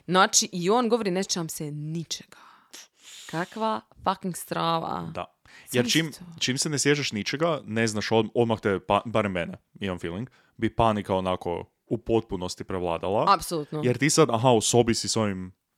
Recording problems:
none

